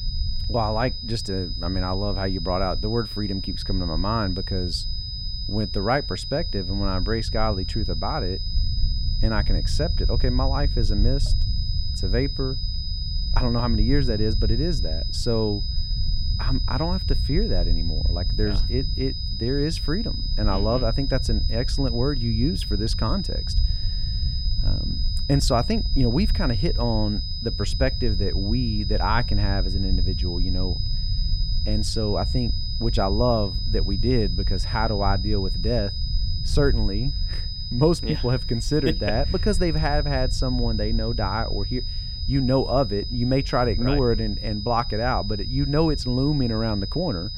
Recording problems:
high-pitched whine; loud; throughout; 5 kHz, 6 dB below the speech
low rumble; noticeable; throughout; 20 dB below the speech

